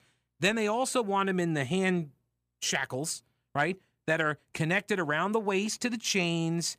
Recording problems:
none

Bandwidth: 15 kHz